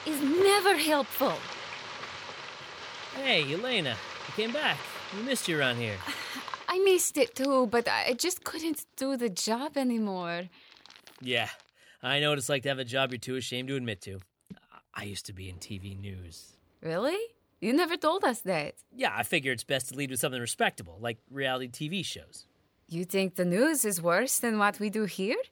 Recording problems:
household noises; noticeable; throughout; 10 dB below the speech

